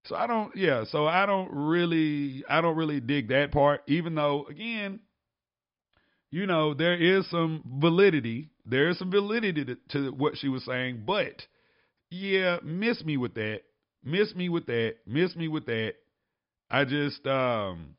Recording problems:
high frequencies cut off; noticeable; nothing above 5.5 kHz

